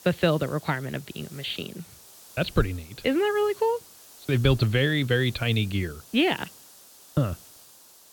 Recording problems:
high frequencies cut off; severe; nothing above 4.5 kHz
hiss; faint; throughout; 20 dB below the speech

